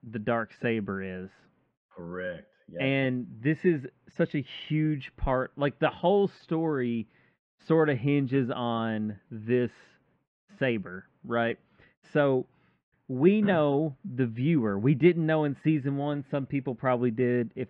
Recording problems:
muffled; very; fading above 2.5 kHz

